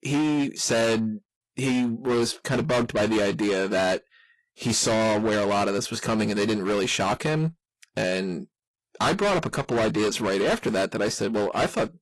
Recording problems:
distortion; heavy; 20% of the sound clipped
garbled, watery; slightly; nothing above 11.5 kHz

